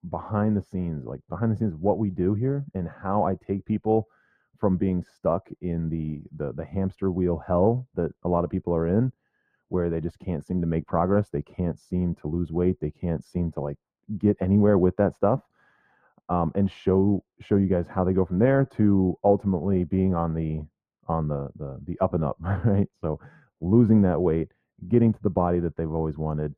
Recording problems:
muffled; very; fading above 2 kHz

